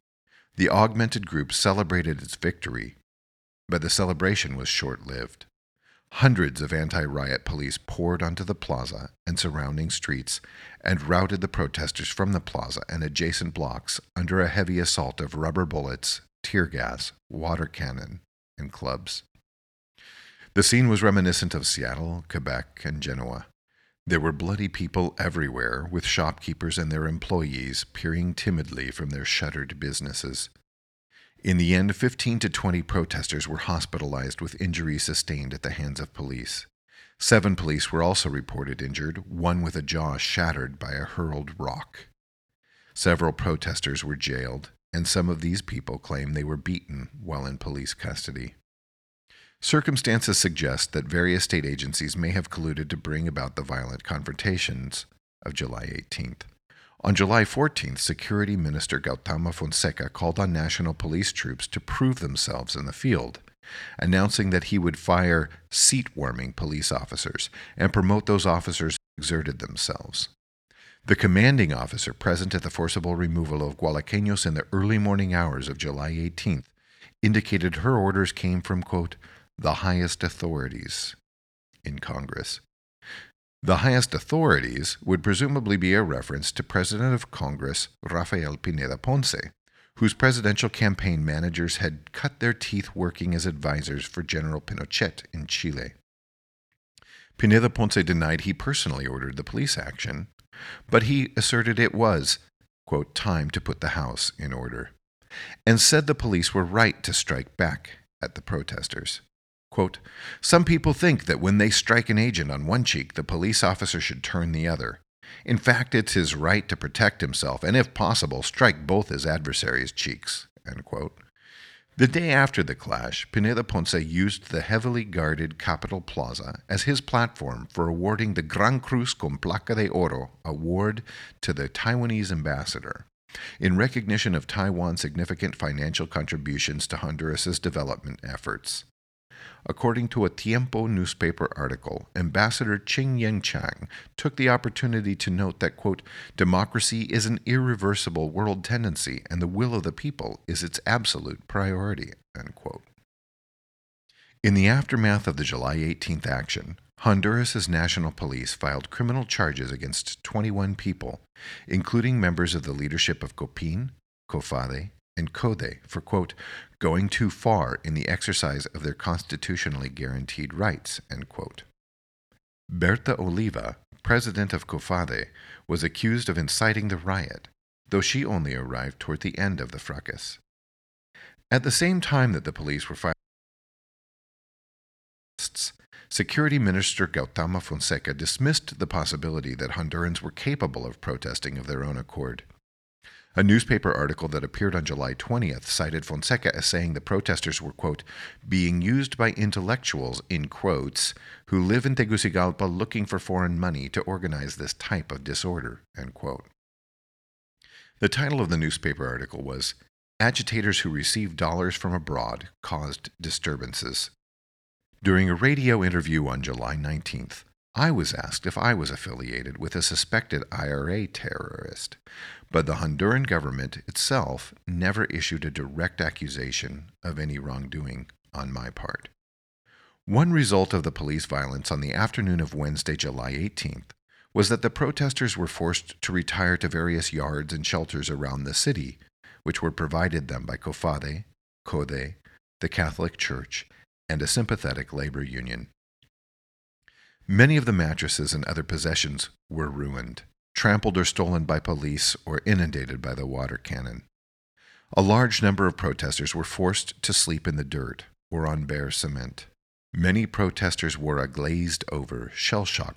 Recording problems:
audio cutting out; at 1:09 and at 3:03 for 2.5 s

